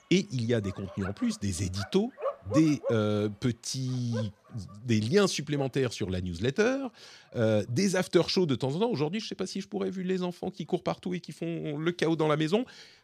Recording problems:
animal sounds; noticeable; throughout; 10 dB below the speech

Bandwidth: 14.5 kHz